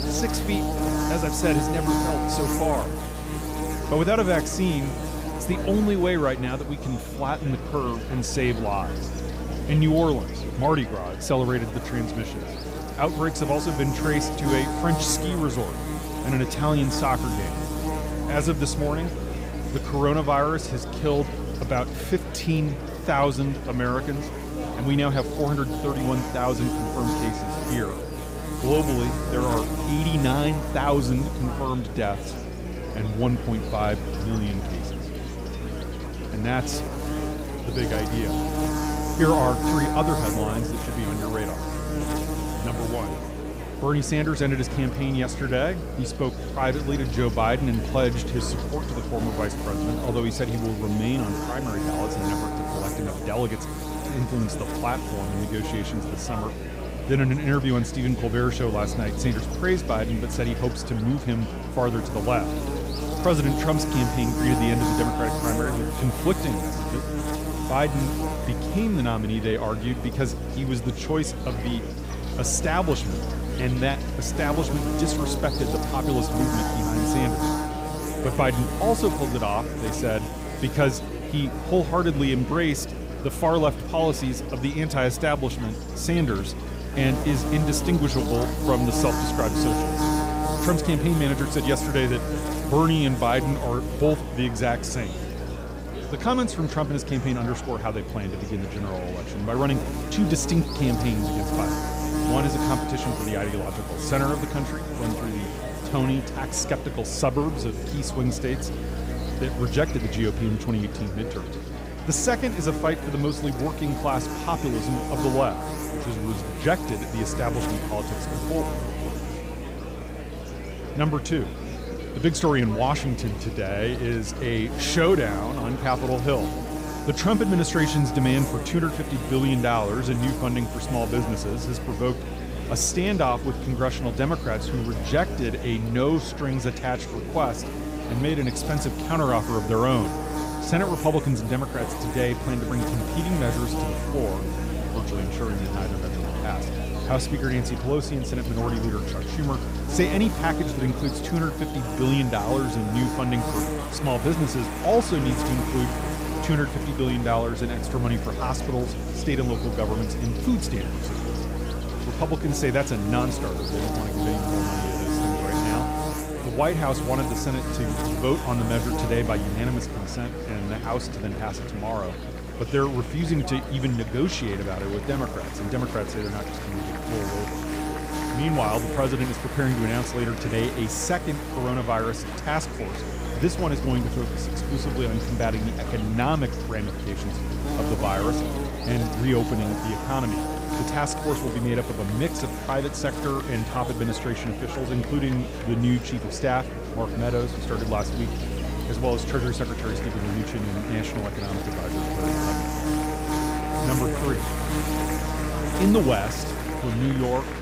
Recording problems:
electrical hum; loud; throughout; 60 Hz, 5 dB below the speech
murmuring crowd; noticeable; throughout; 10 dB below the speech

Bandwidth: 15.5 kHz